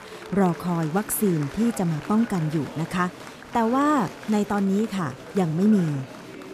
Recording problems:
murmuring crowd; noticeable; throughout; 15 dB below the speech

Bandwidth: 14.5 kHz